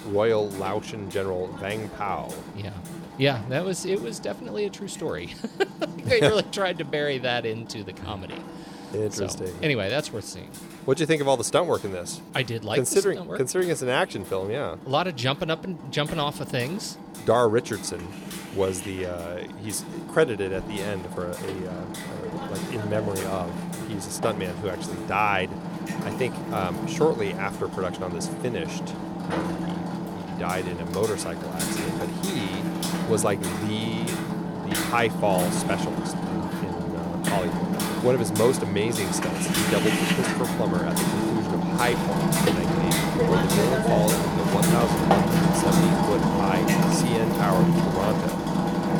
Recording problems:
machinery noise; very loud; throughout; 1 dB above the speech

